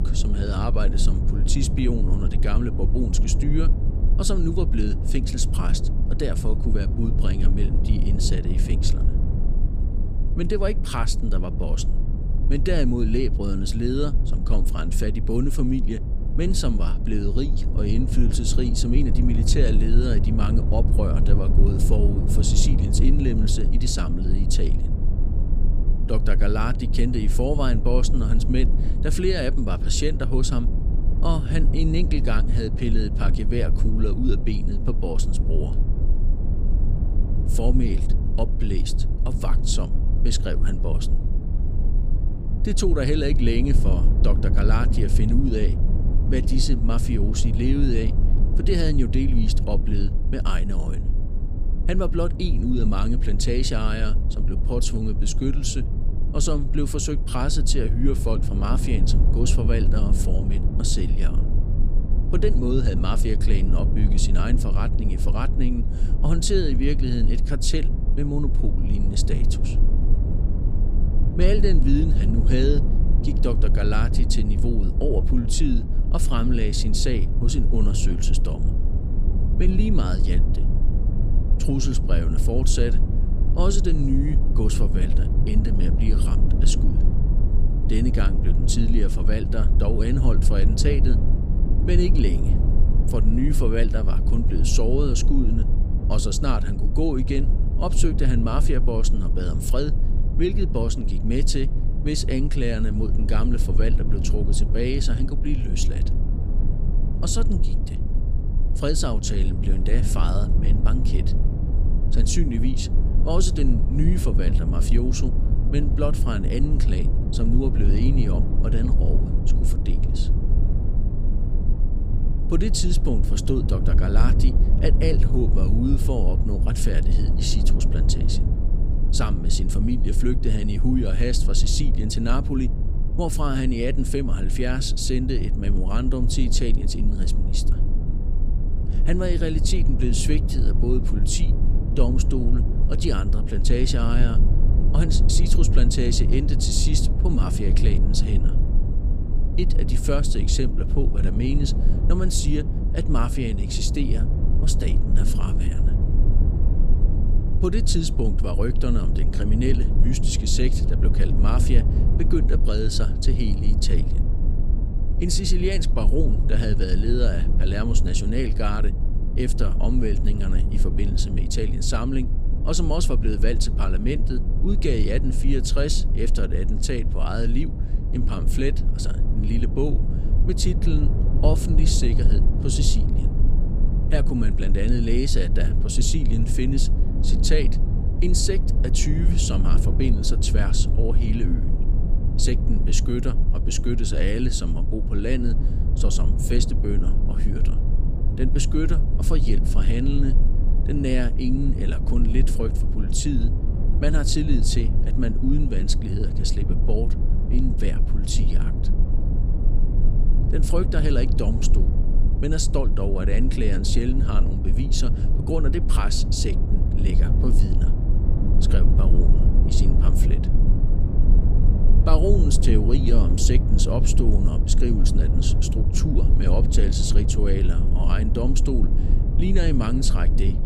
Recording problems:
low rumble; loud; throughout; 7 dB below the speech

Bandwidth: 15 kHz